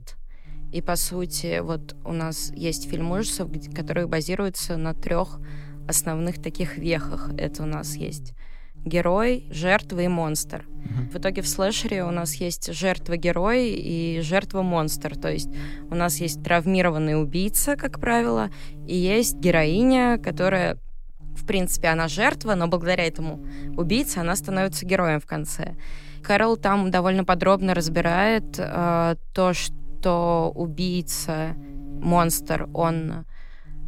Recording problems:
electrical hum; faint; throughout; 50 Hz, 25 dB below the speech

